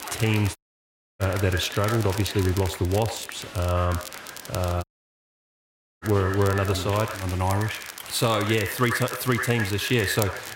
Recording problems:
echo of what is said; strong; throughout; 90 ms later, 9 dB below the speech
crowd noise; noticeable; throughout; 15 dB below the speech
crackle, like an old record; noticeable; 15 dB below the speech
audio cutting out; at 0.5 s for 0.5 s and at 5 s for 1 s

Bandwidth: 16 kHz